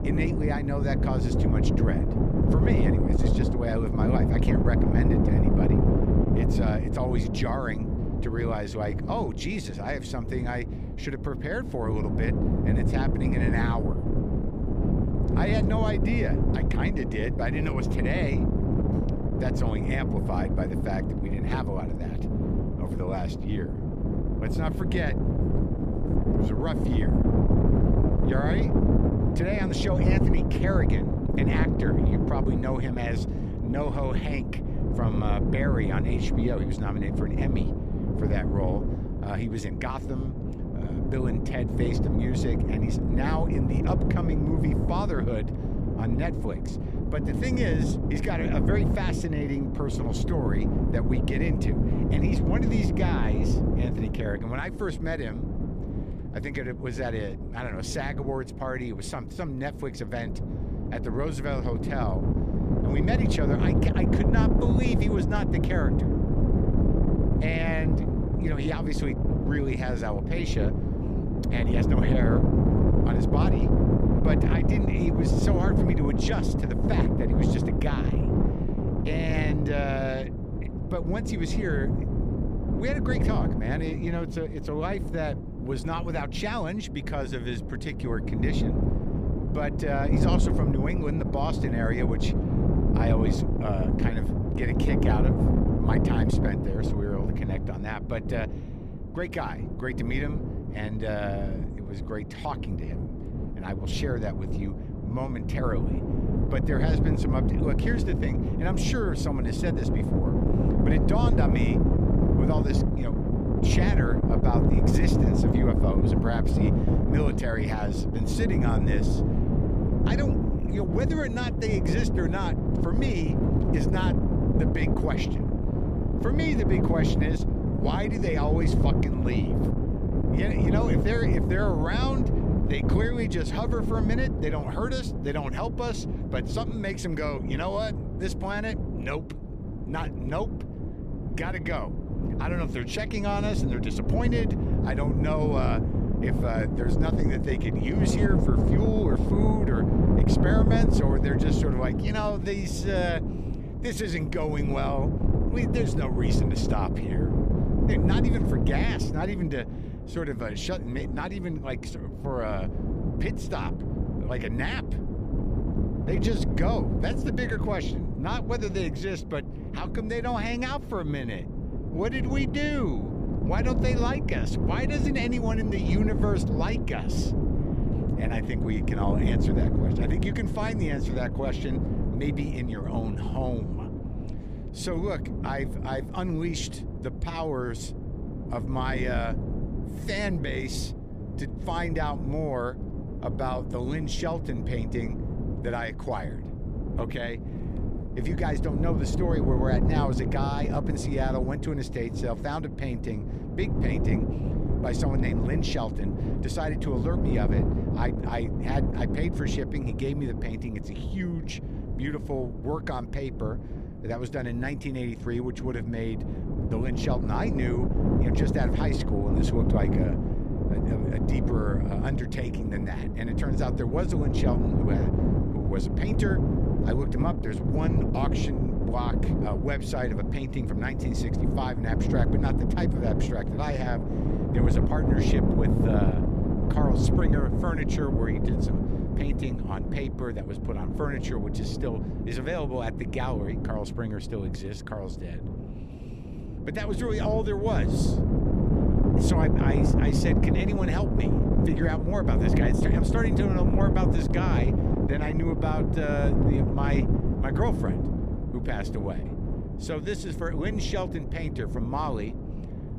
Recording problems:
wind noise on the microphone; heavy; 1 dB below the speech

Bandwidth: 14.5 kHz